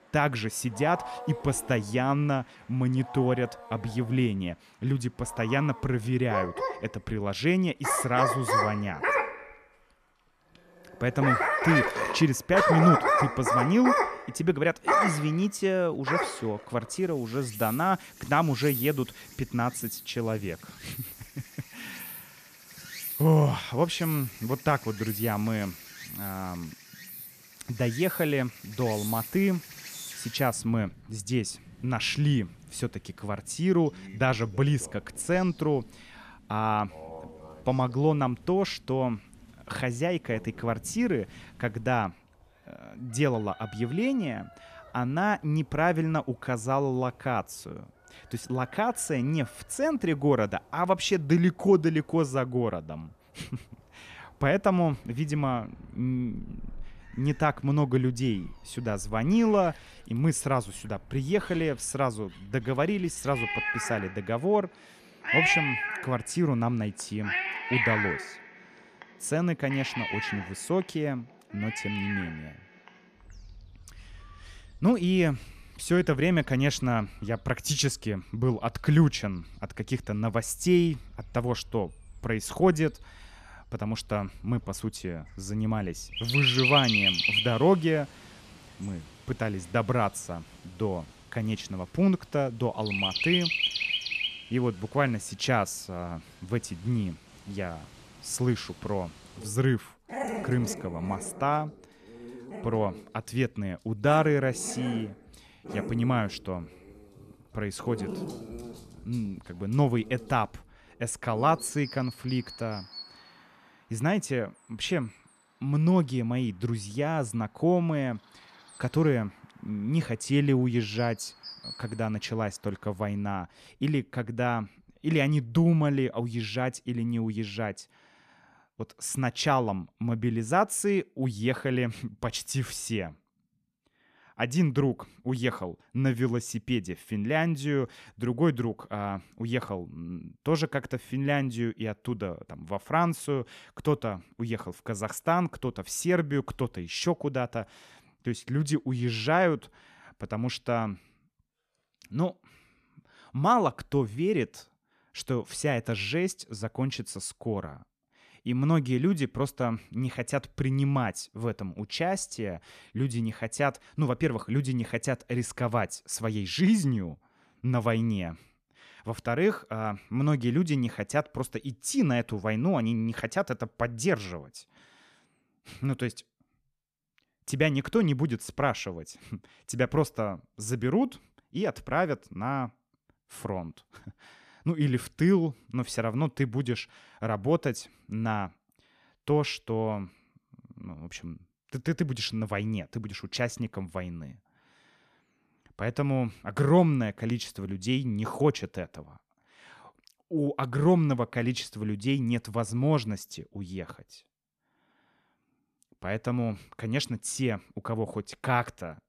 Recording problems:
animal sounds; loud; until 2:06; 2 dB below the speech

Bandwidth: 14.5 kHz